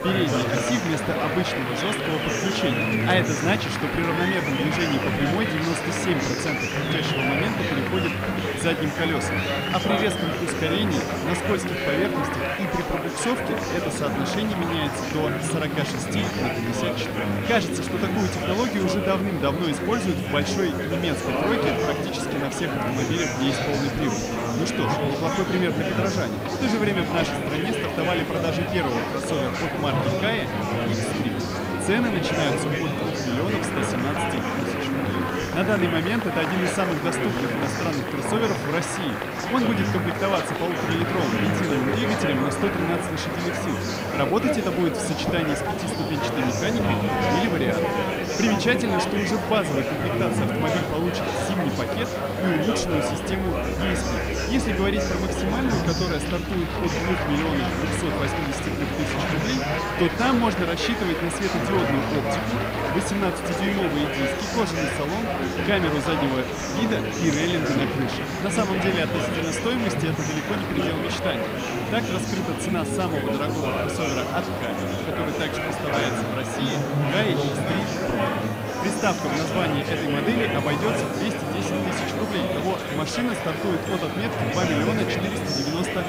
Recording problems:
murmuring crowd; very loud; throughout; 1 dB above the speech
background music; noticeable; throughout; 15 dB below the speech
hiss; noticeable; throughout; 20 dB below the speech

